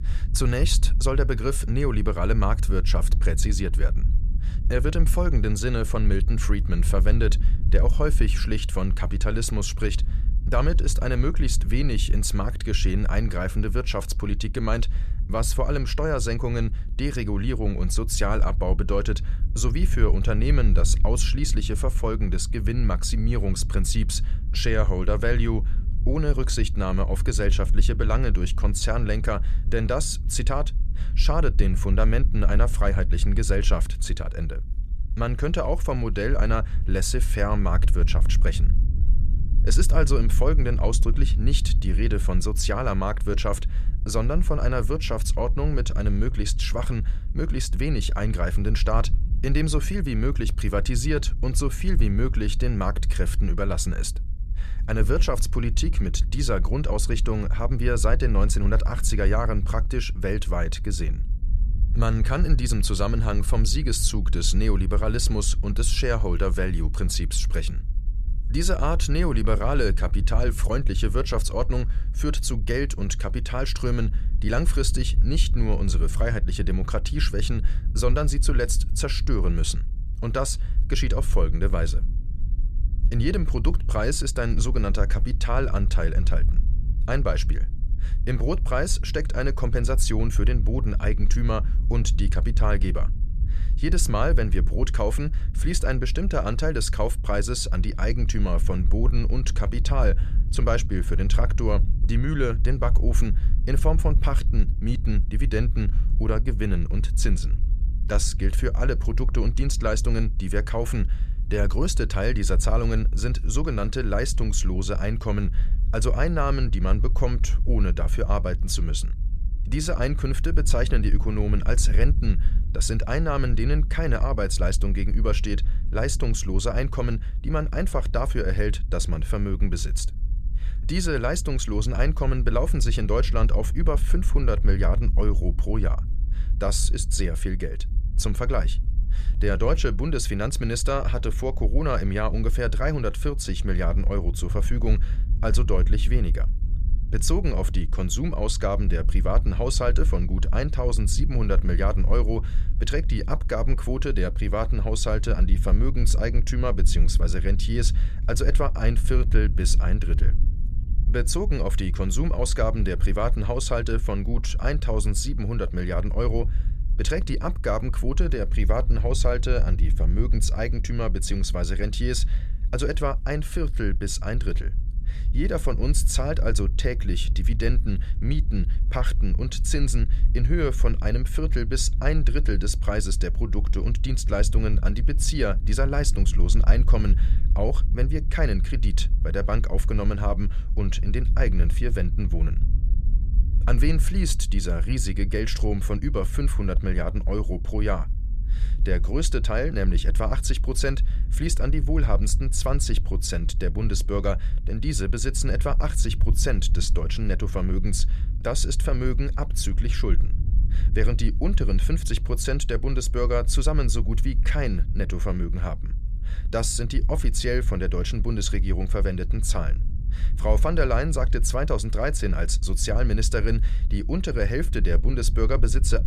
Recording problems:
low rumble; noticeable; throughout; 15 dB below the speech

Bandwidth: 14.5 kHz